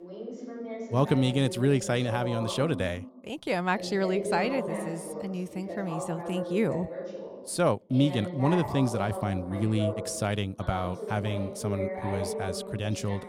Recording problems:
voice in the background; loud; throughout; 7 dB below the speech

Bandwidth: 18.5 kHz